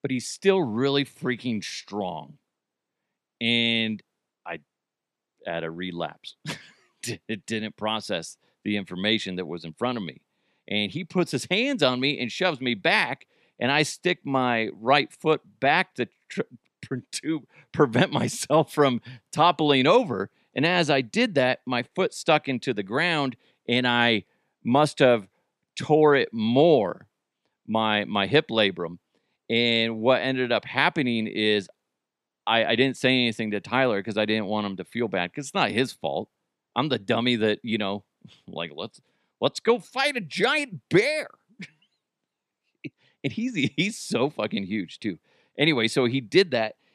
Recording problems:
none

